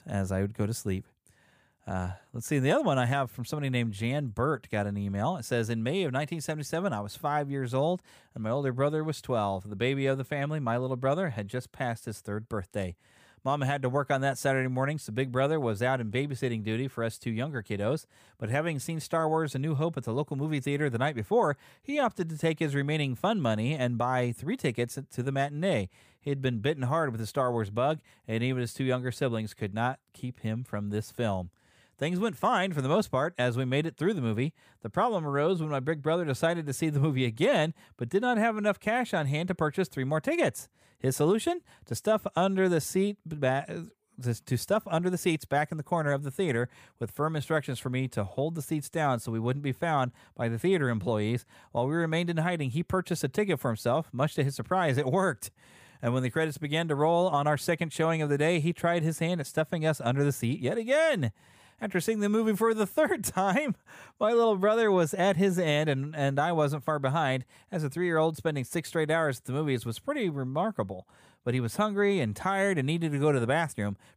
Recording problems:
none

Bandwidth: 15 kHz